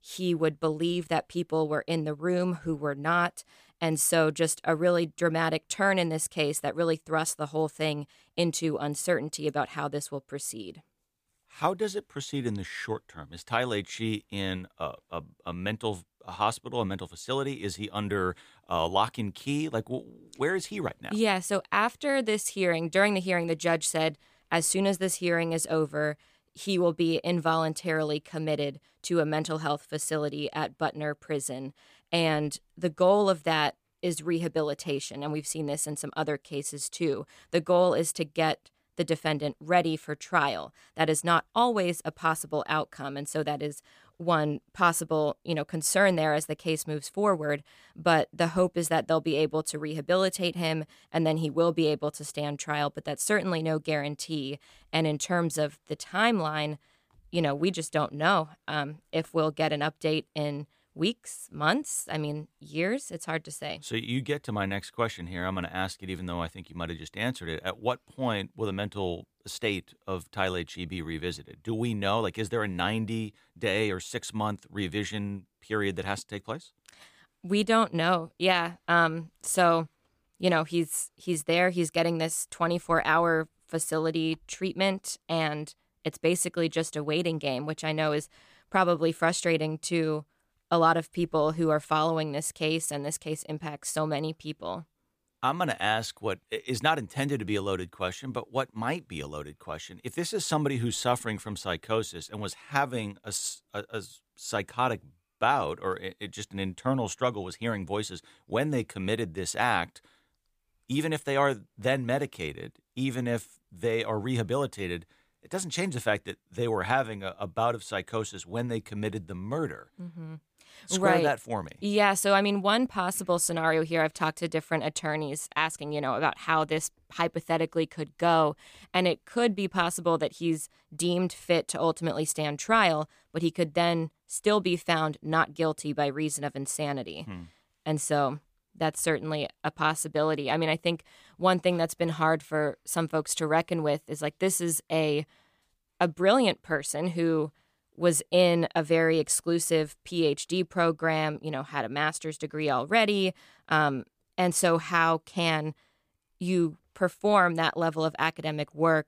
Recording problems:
none

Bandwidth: 15 kHz